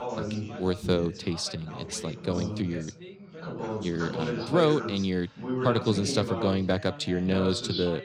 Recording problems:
background chatter; loud; throughout; 3 voices, 6 dB below the speech

